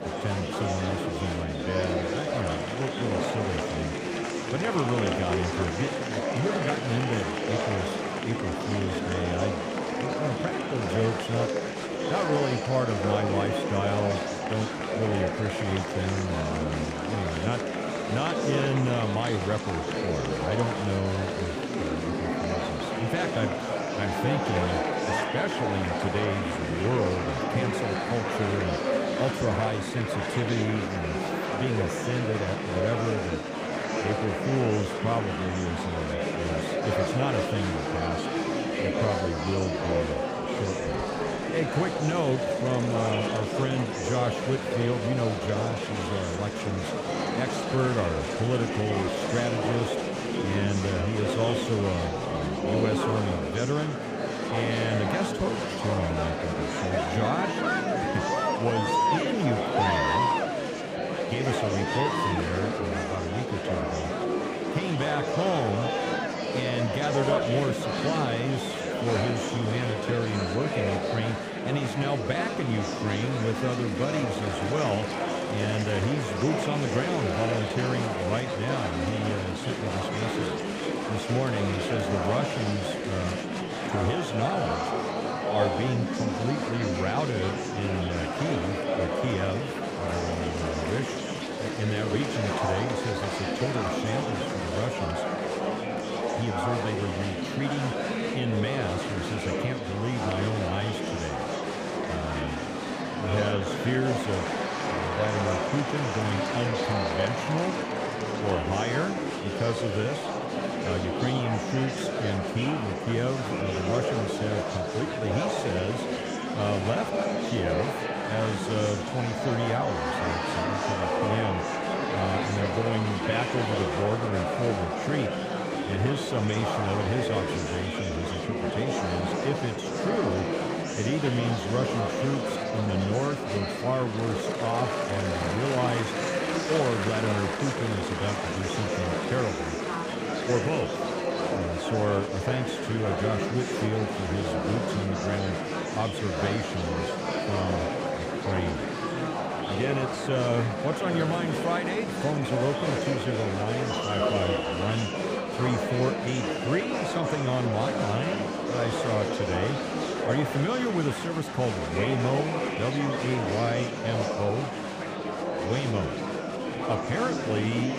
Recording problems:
murmuring crowd; very loud; throughout; 1 dB above the speech

